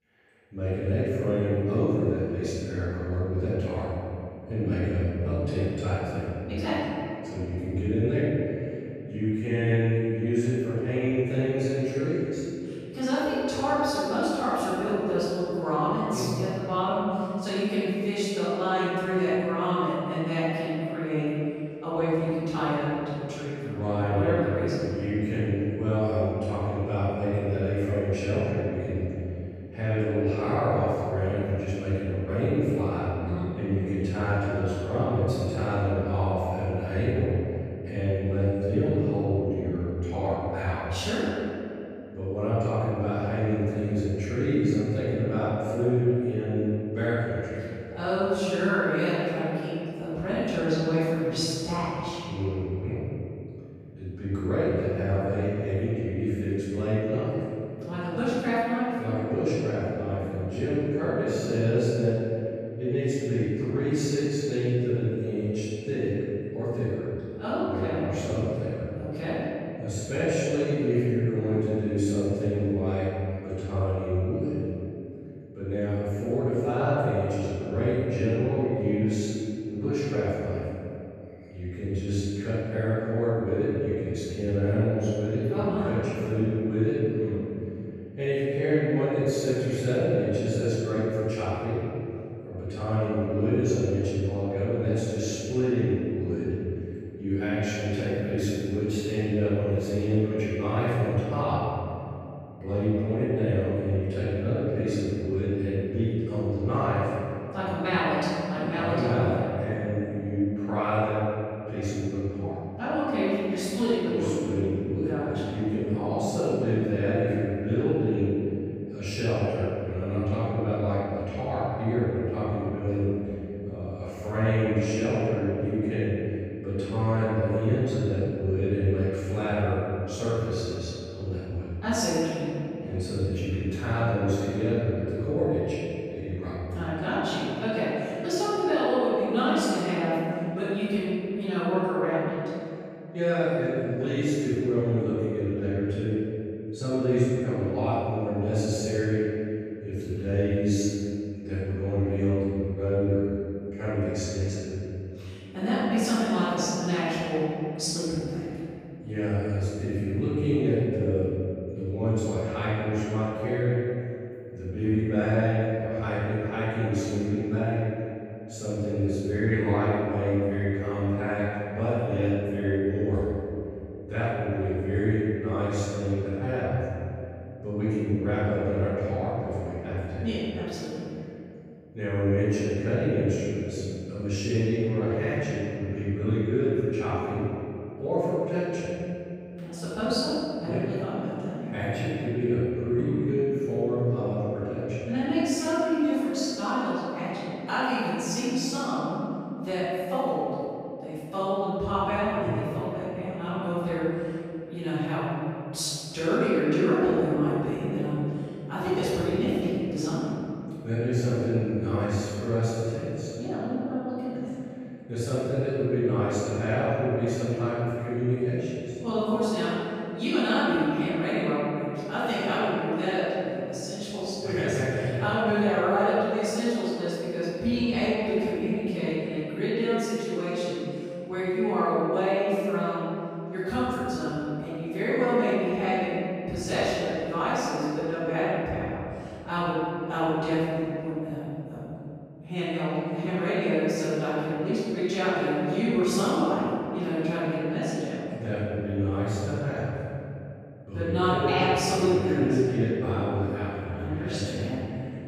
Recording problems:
room echo; strong; dies away in 2.6 s
off-mic speech; far

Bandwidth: 15.5 kHz